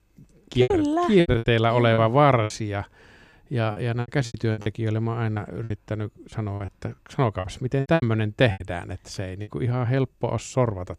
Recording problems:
choppy; very; from 0.5 to 2.5 s, from 3.5 to 5.5 s and from 6.5 to 9.5 s; 15% of the speech affected

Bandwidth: 14 kHz